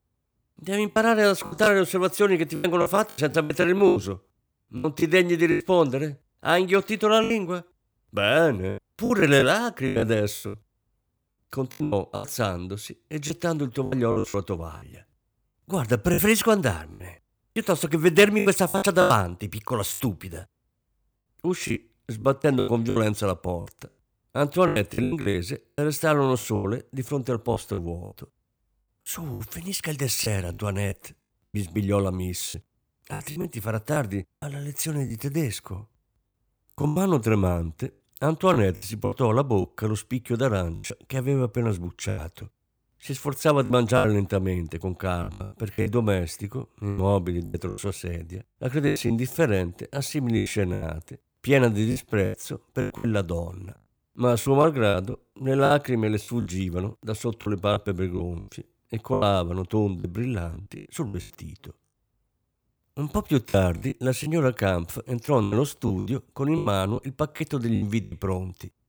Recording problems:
choppy; very; 11% of the speech affected

